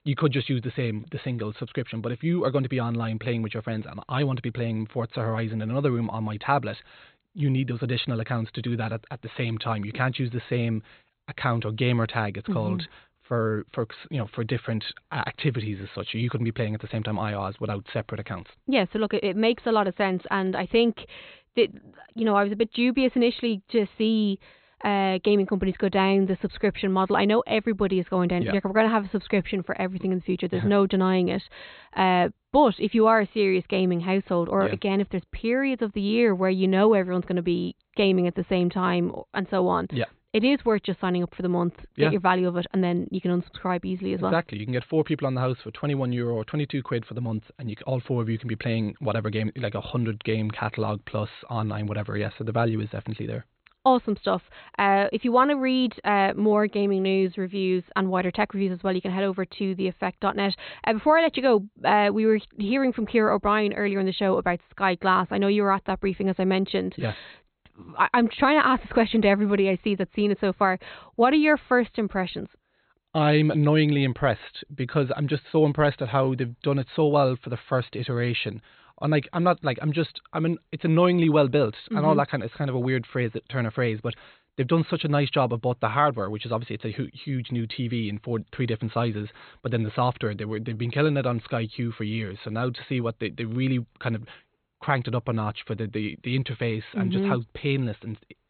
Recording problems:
high frequencies cut off; severe; nothing above 4 kHz

